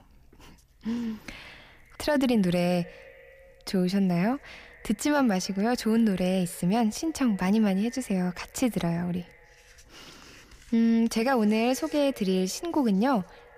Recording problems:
echo of what is said; faint; throughout; 140 ms later, 25 dB below the speech

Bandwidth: 15 kHz